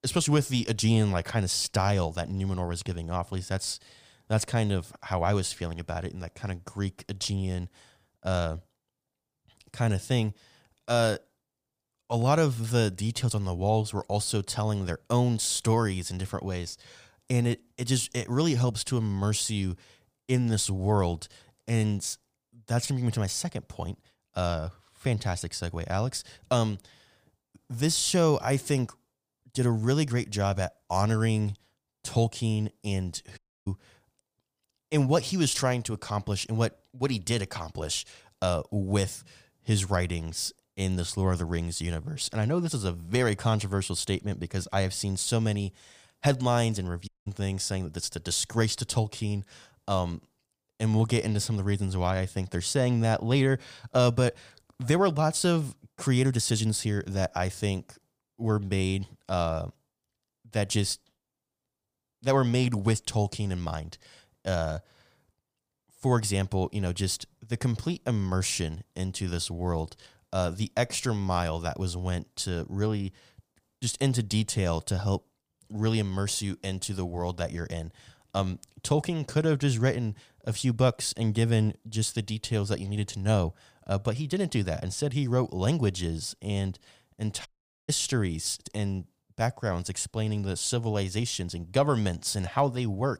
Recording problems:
audio cutting out; at 33 s, at 47 s and at 1:27

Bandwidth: 15 kHz